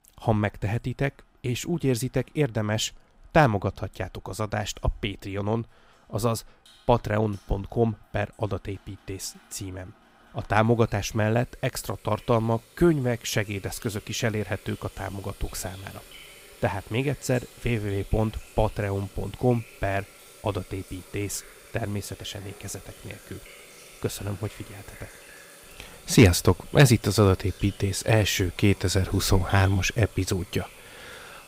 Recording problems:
household noises; faint; throughout; 20 dB below the speech

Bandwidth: 15.5 kHz